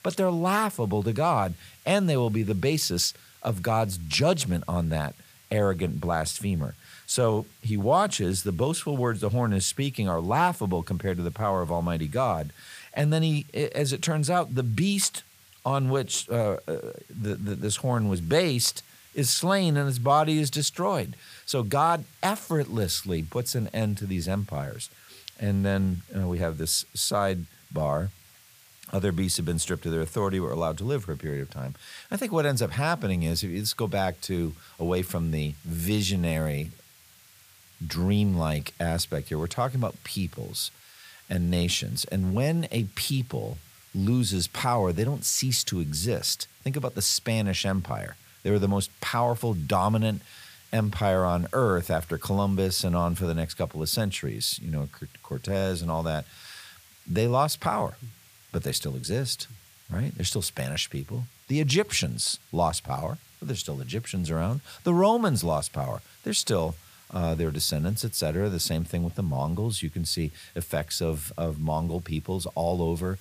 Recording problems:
hiss; faint; throughout; 25 dB below the speech

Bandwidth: 15 kHz